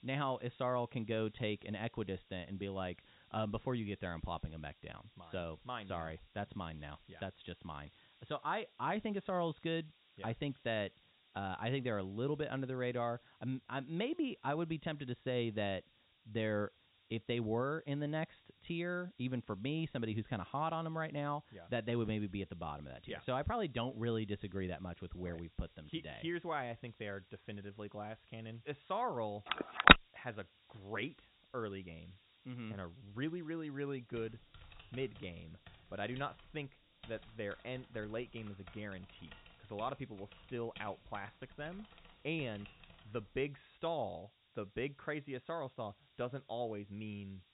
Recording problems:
high frequencies cut off; severe; nothing above 4 kHz
hiss; faint; throughout; 25 dB below the speech
phone ringing; loud; at 30 s; peak 20 dB above the speech
keyboard typing; faint; from 34 to 43 s; peak 15 dB below the speech

